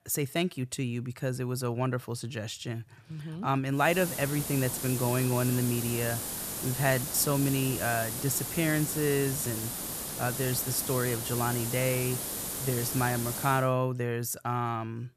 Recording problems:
hiss; loud; from 4 to 14 s; 3 dB below the speech

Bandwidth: 14.5 kHz